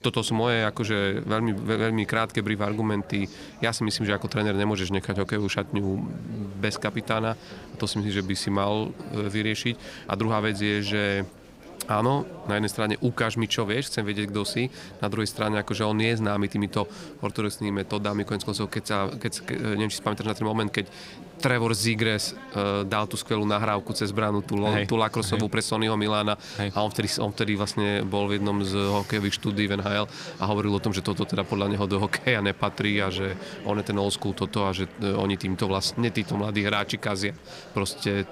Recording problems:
chatter from many people; noticeable; throughout; 15 dB below the speech

